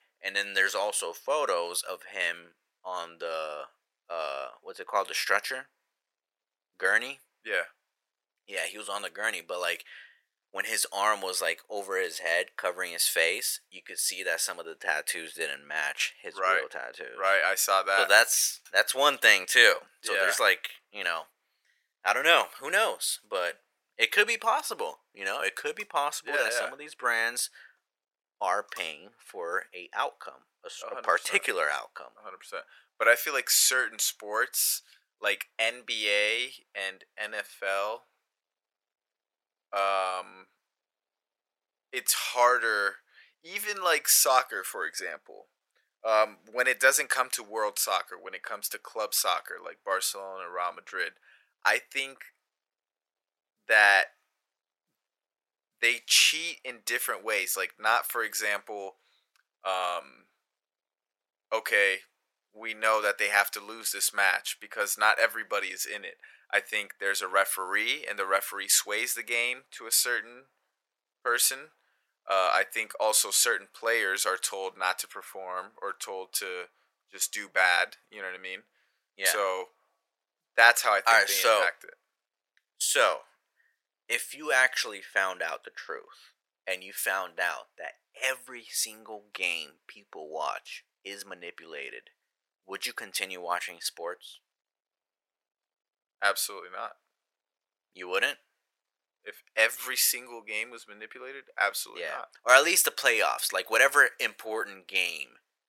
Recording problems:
thin; very; fading below 500 Hz

